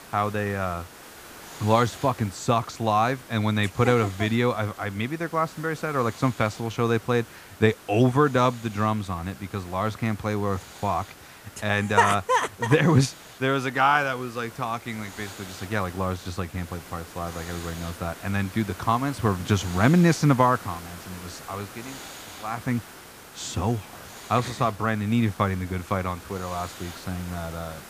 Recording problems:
hiss; noticeable; throughout; 15 dB below the speech

